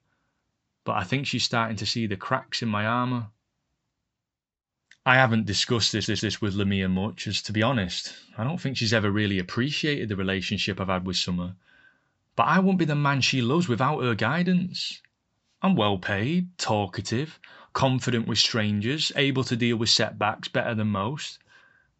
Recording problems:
high frequencies cut off; noticeable; nothing above 7.5 kHz
audio stuttering; at 6 s

